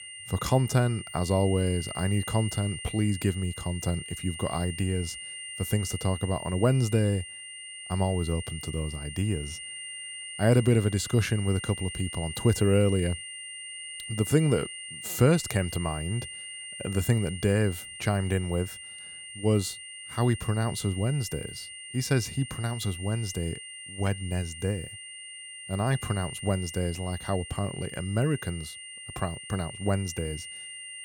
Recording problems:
high-pitched whine; loud; throughout; 3 kHz, 10 dB below the speech

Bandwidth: 18 kHz